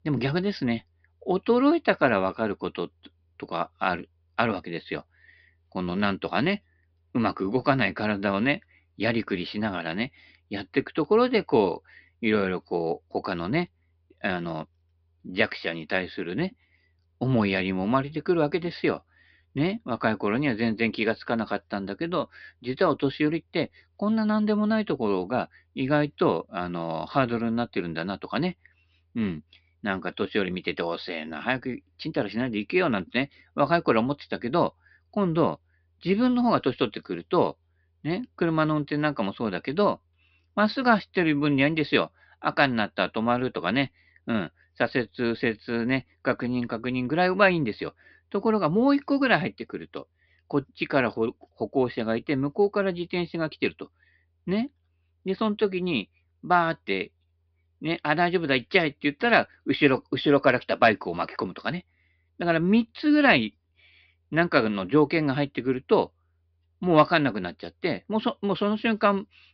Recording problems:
high frequencies cut off; noticeable; nothing above 5.5 kHz

